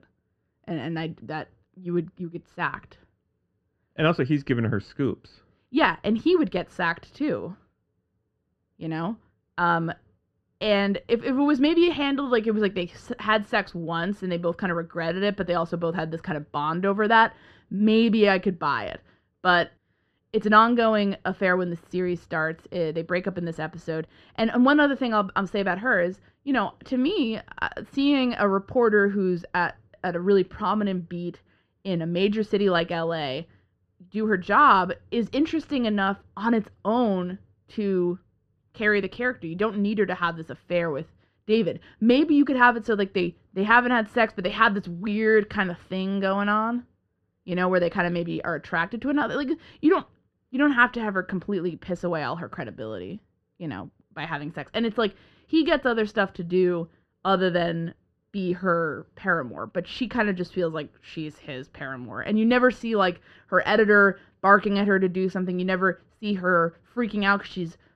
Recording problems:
muffled; very; fading above 1.5 kHz

